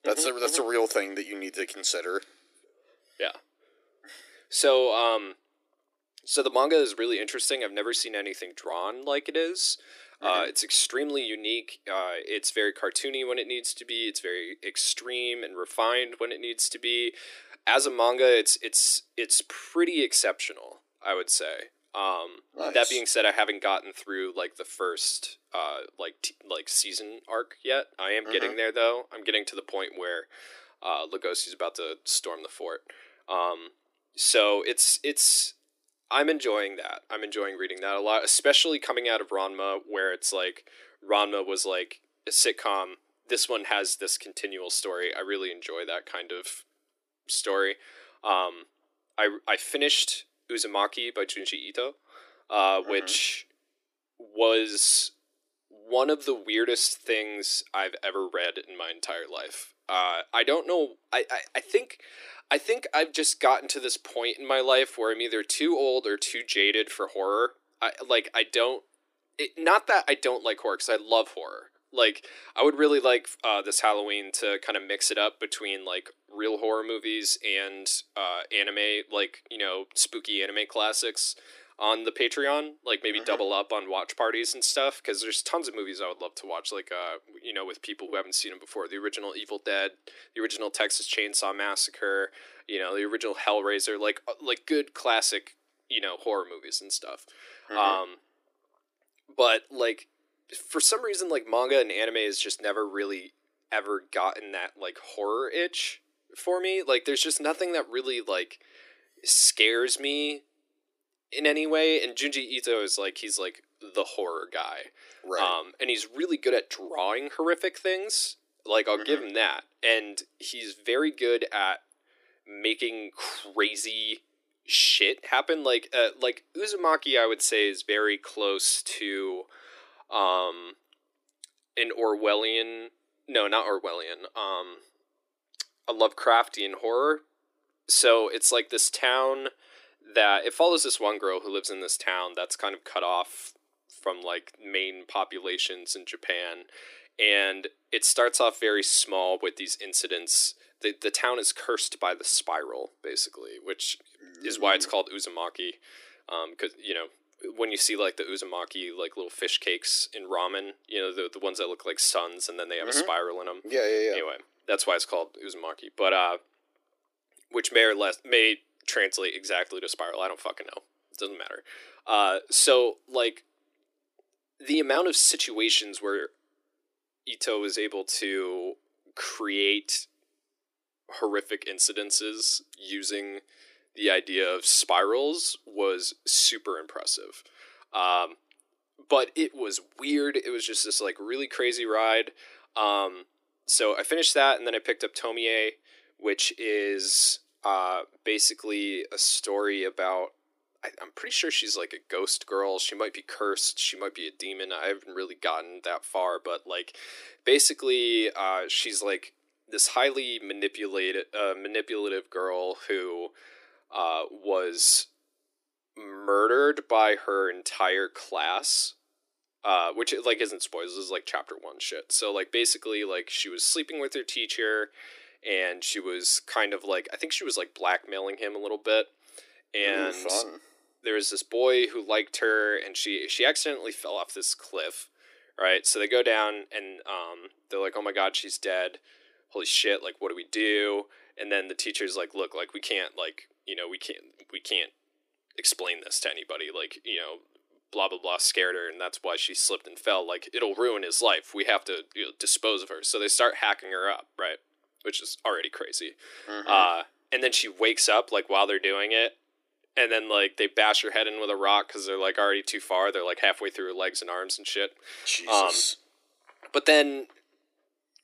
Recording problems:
thin; somewhat; fading below 300 Hz

